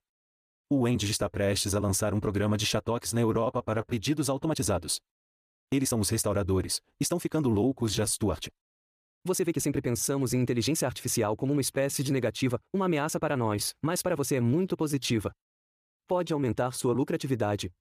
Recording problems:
uneven, jittery; strongly; from 0.5 to 17 s

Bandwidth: 14.5 kHz